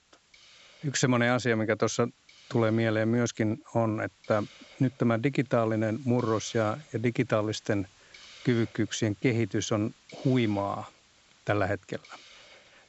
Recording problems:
high frequencies cut off; noticeable; nothing above 7.5 kHz
hiss; faint; throughout; 25 dB below the speech

